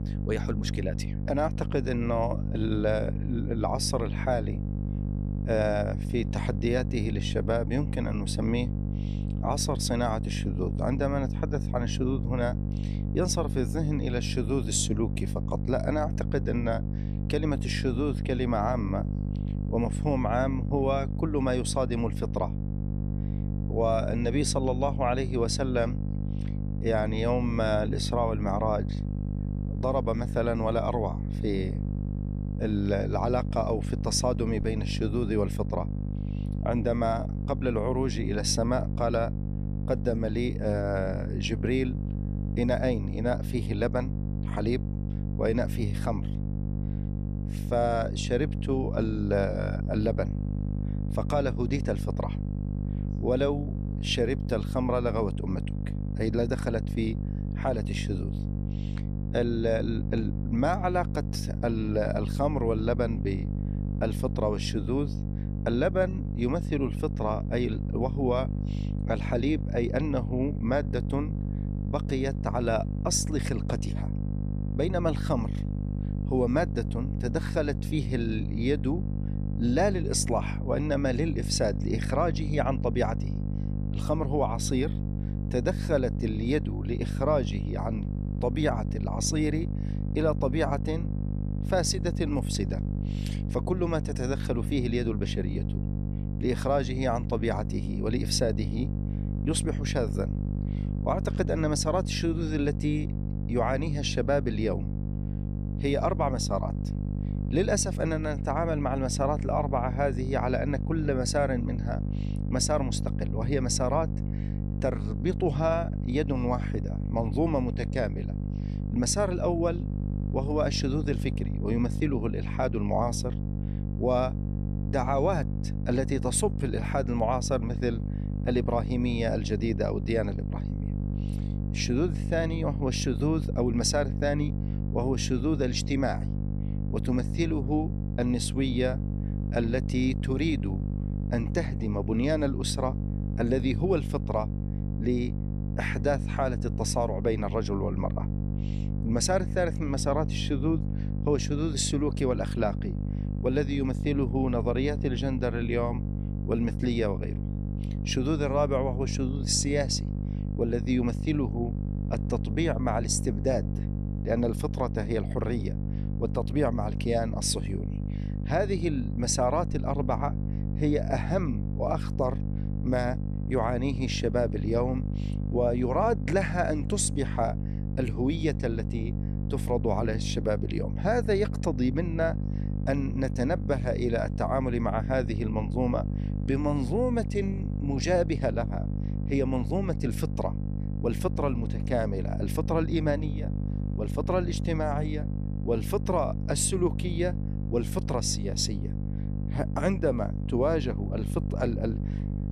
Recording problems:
electrical hum; noticeable; throughout; 50 Hz, 10 dB below the speech

